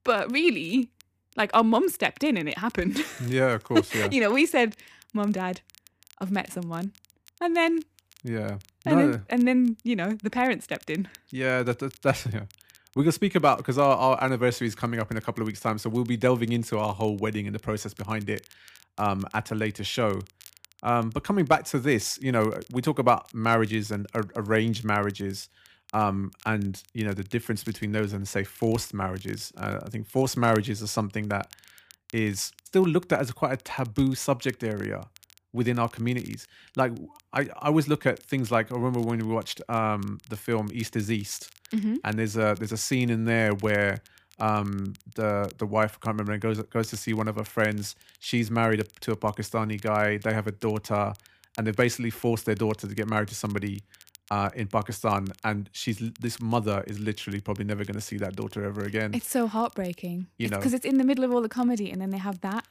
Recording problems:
crackle, like an old record; faint; 25 dB below the speech

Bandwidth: 15 kHz